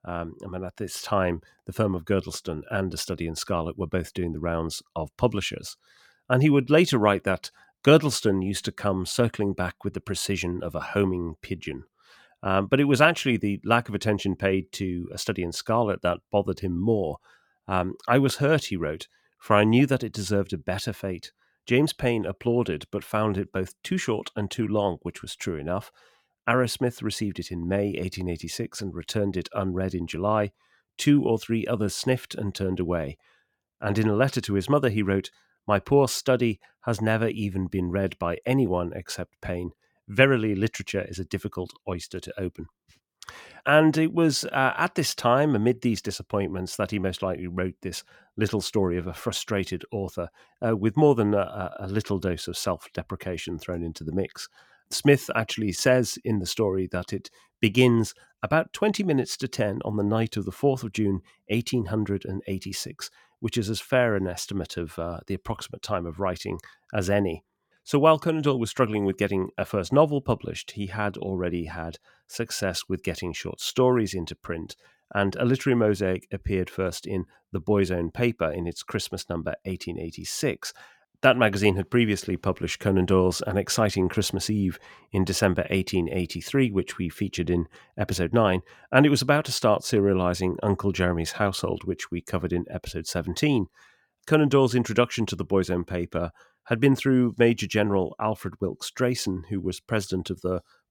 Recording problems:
none

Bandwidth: 17.5 kHz